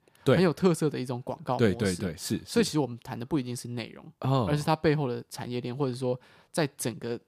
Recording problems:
none

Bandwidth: 15 kHz